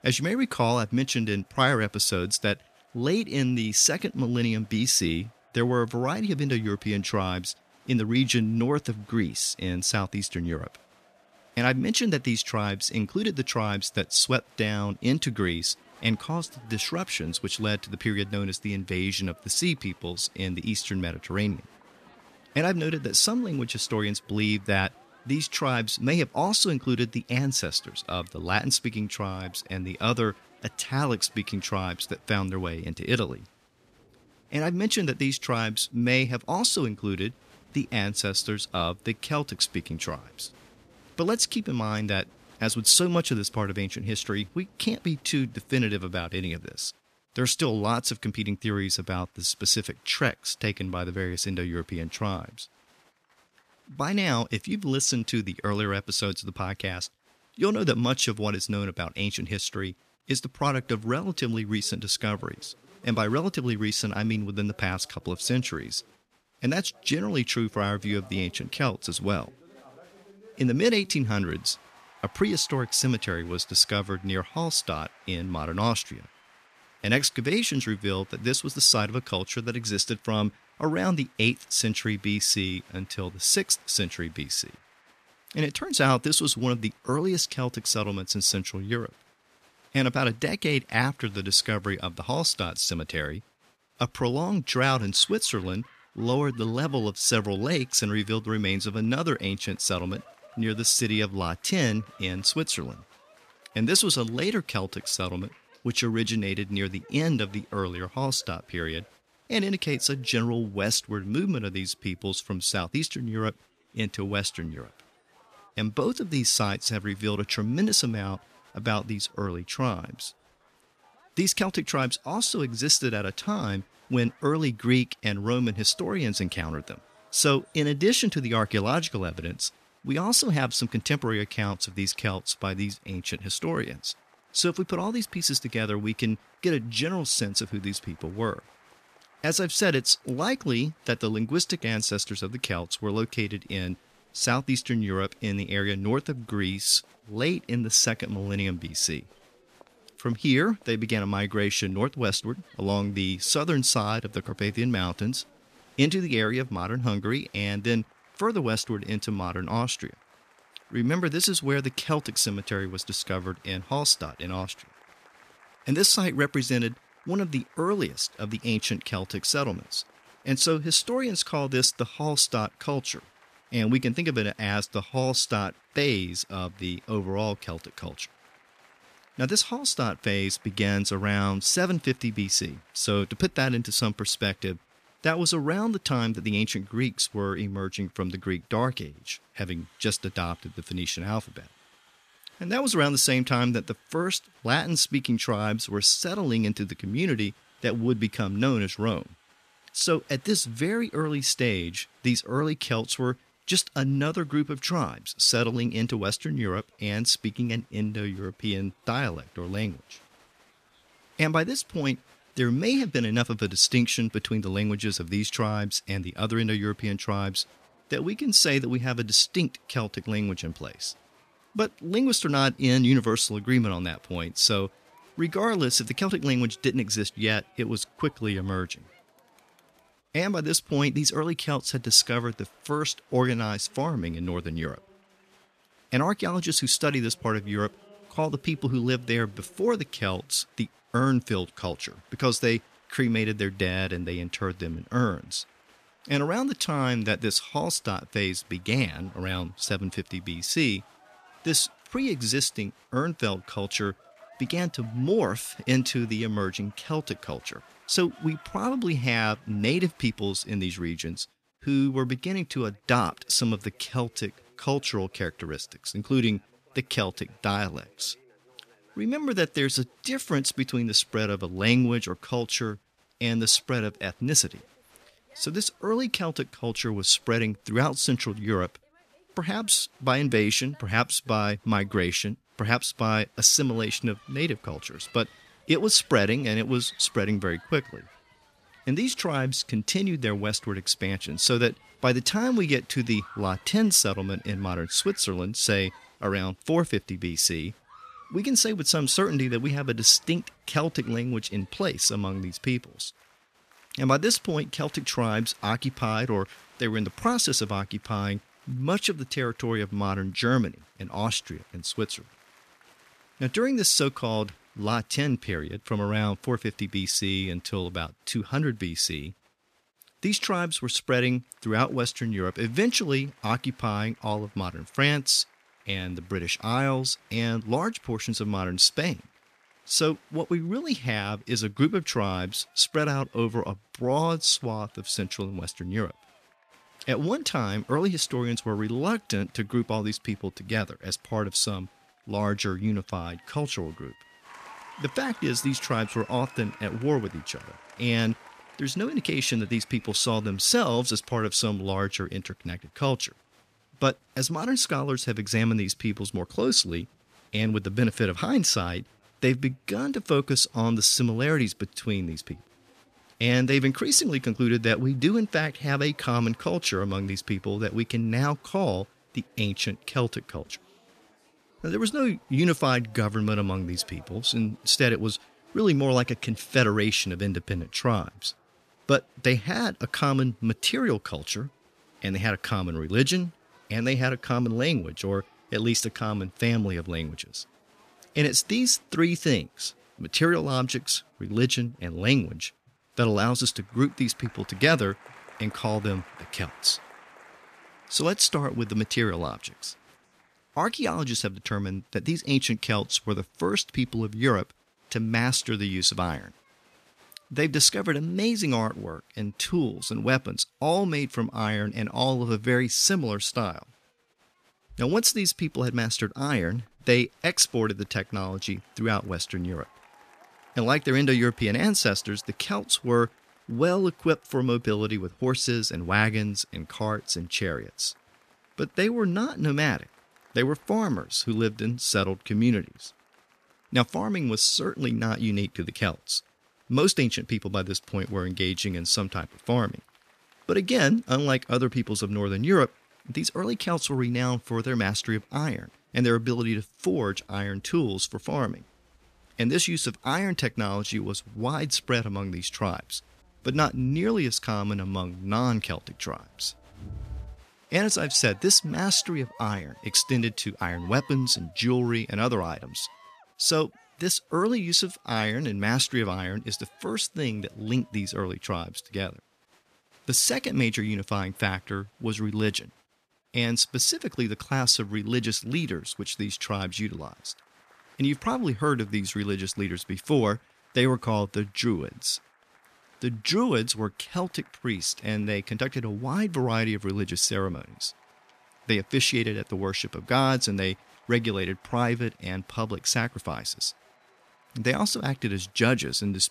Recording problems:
crowd noise; faint; throughout; 30 dB below the speech

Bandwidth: 14.5 kHz